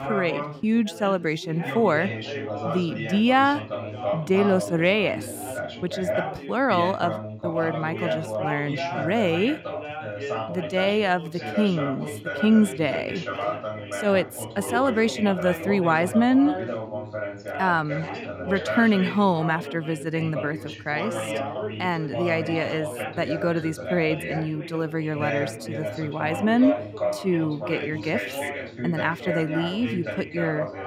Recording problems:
background chatter; loud; throughout; 3 voices, 7 dB below the speech

